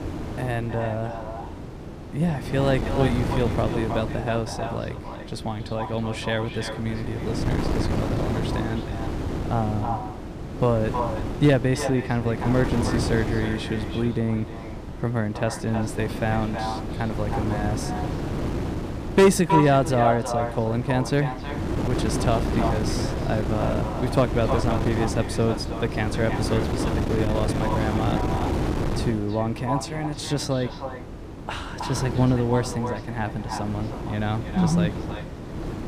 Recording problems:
echo of what is said; strong; throughout; 320 ms later, 8 dB below the speech
wind noise on the microphone; heavy; 6 dB below the speech

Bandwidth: 15 kHz